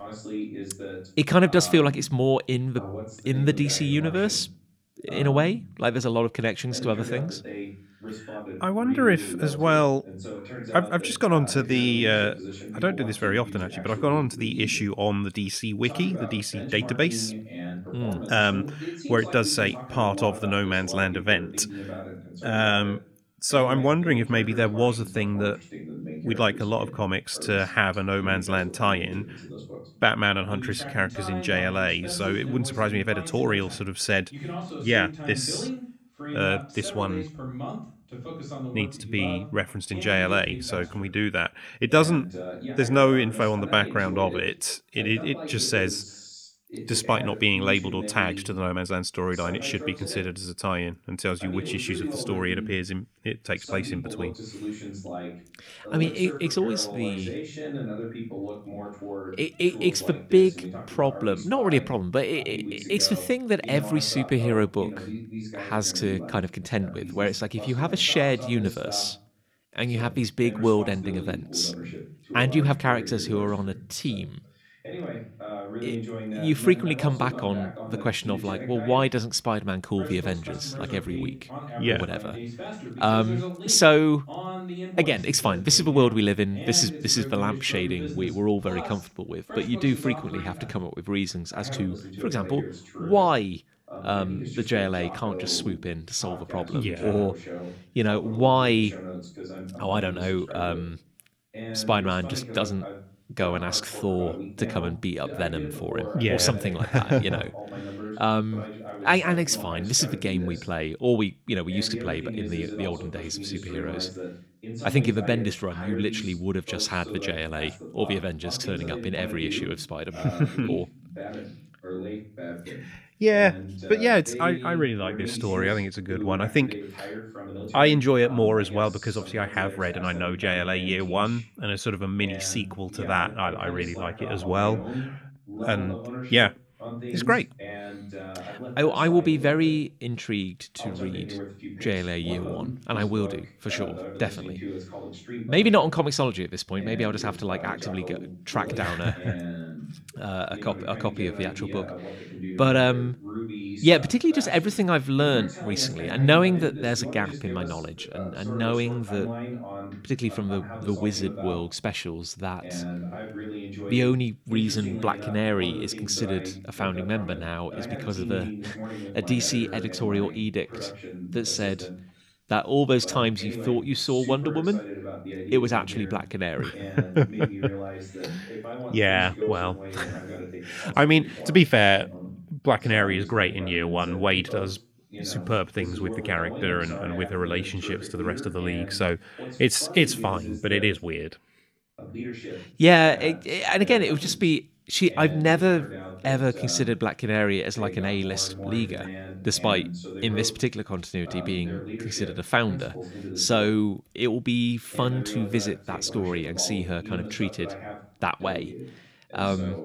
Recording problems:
voice in the background; noticeable; throughout; 10 dB below the speech

